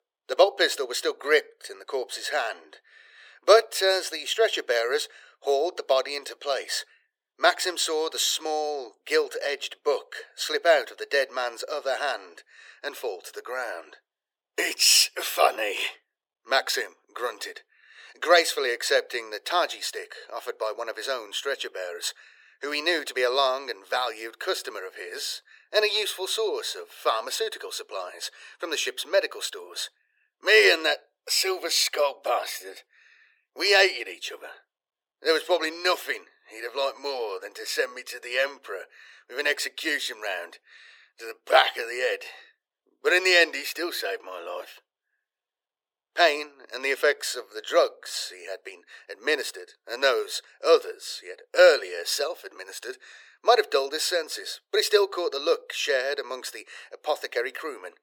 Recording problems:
thin; very; fading below 350 Hz

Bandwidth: 17.5 kHz